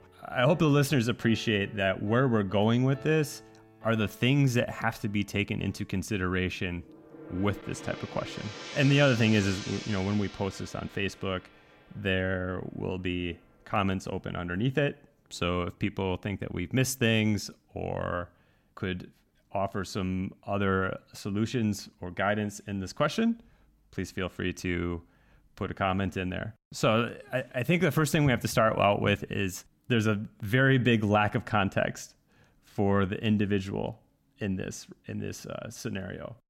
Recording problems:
background music; noticeable; until 16 s; 15 dB below the speech

